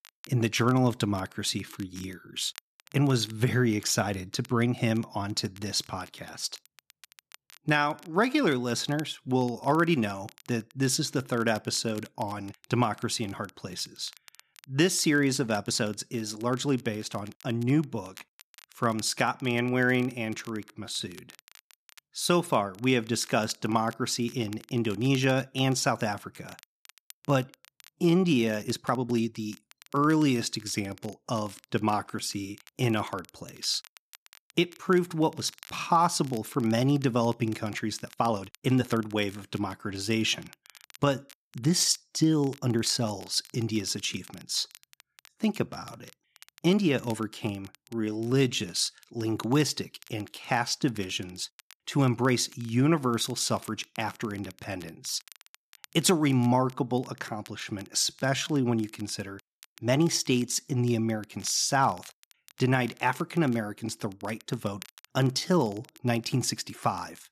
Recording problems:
crackle, like an old record; faint; 25 dB below the speech
uneven, jittery; strongly; from 7.5 s to 1:06

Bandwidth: 14 kHz